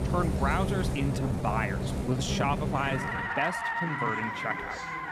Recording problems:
traffic noise; very loud; throughout; 1 dB above the speech
chatter from many people; noticeable; throughout; 10 dB below the speech
uneven, jittery; strongly; from 1 to 4 s

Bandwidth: 14.5 kHz